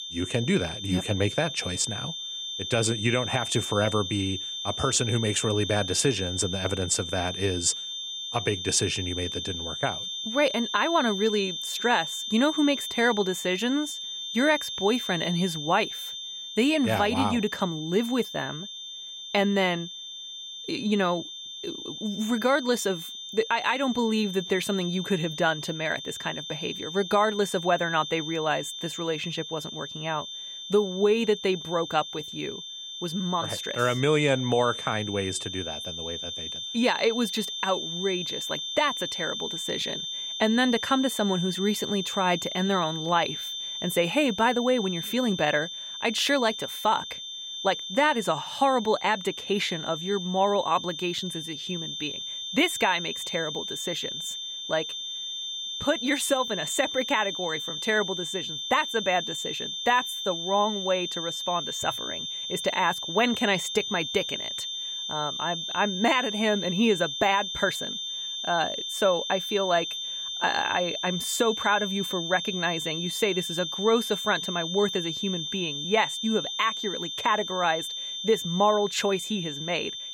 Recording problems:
high-pitched whine; loud; throughout; 3.5 kHz, 5 dB below the speech

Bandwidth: 16.5 kHz